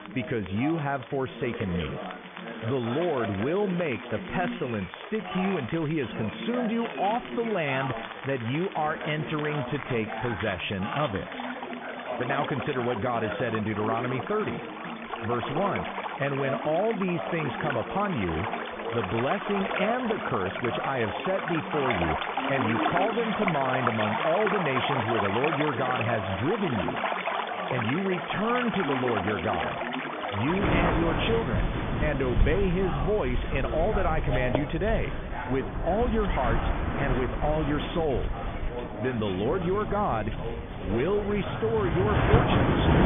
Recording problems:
high frequencies cut off; severe; nothing above 3.5 kHz
rain or running water; loud; throughout; 3 dB below the speech
background chatter; loud; throughout; 4 voices, 8 dB below the speech

